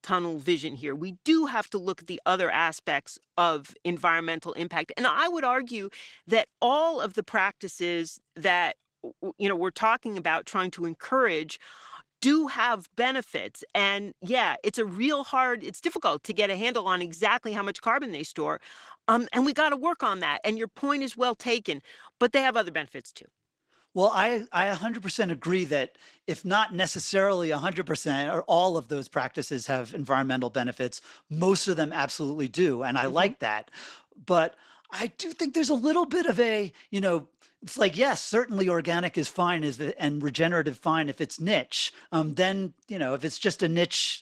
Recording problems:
garbled, watery; slightly; nothing above 16 kHz

